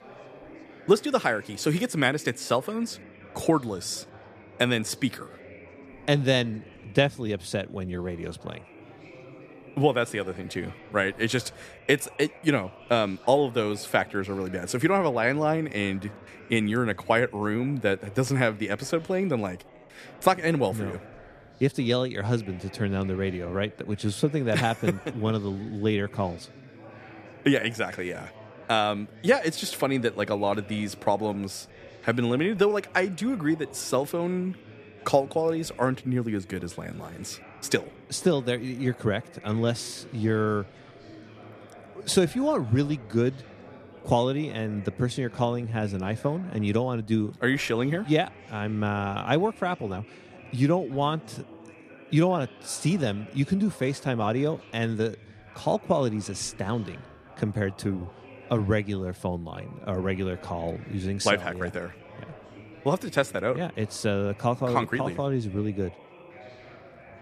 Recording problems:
chatter from many people; faint; throughout; 20 dB below the speech

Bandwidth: 14.5 kHz